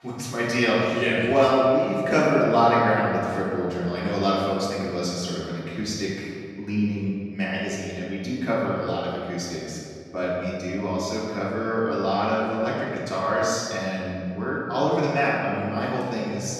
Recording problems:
room echo; strong; dies away in 2.2 s
off-mic speech; far

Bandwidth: 13.5 kHz